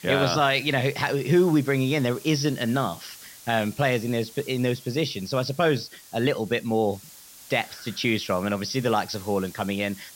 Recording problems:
high frequencies cut off; noticeable; nothing above 6 kHz
hiss; noticeable; throughout; 20 dB below the speech

